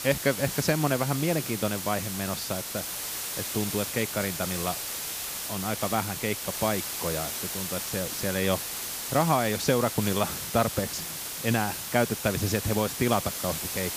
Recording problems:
hiss; loud; throughout; 3 dB below the speech

